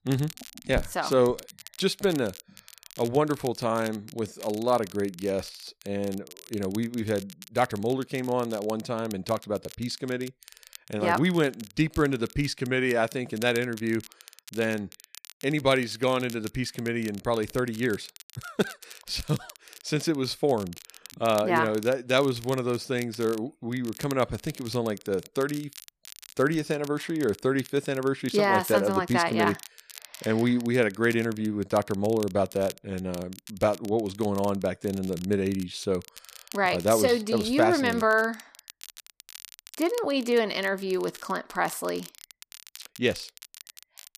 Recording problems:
crackle, like an old record; noticeable; 20 dB below the speech

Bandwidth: 14.5 kHz